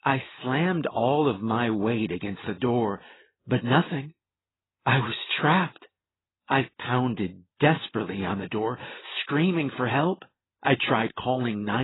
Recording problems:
garbled, watery; badly; nothing above 4 kHz
abrupt cut into speech; at the end

